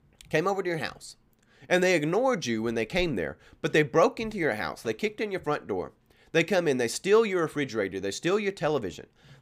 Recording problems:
none

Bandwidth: 15.5 kHz